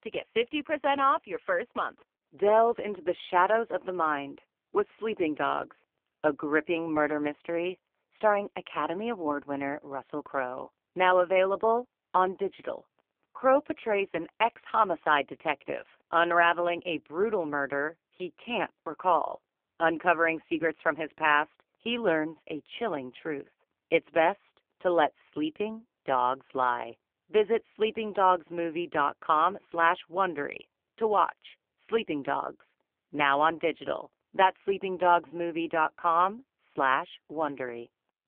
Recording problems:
phone-call audio; poor line; nothing above 3.5 kHz

